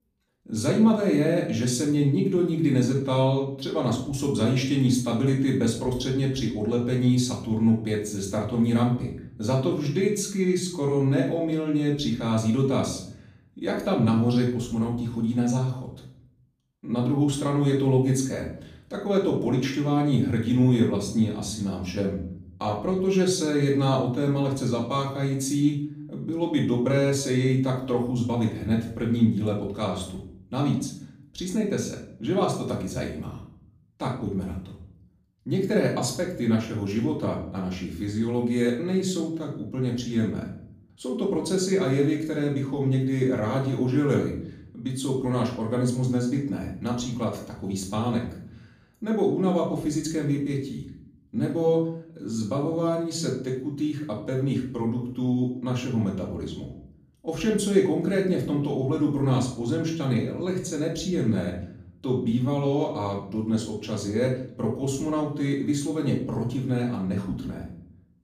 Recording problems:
off-mic speech; far
room echo; slight; dies away in 0.5 s

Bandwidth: 15 kHz